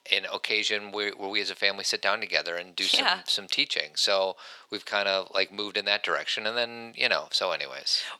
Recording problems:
thin; very; fading below 700 Hz

